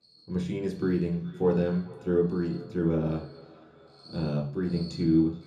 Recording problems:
off-mic speech; far
echo of what is said; faint; throughout; 420 ms later, 25 dB below the speech
room echo; slight; dies away in 0.6 s
animal sounds; faint; throughout; 25 dB below the speech

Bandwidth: 14 kHz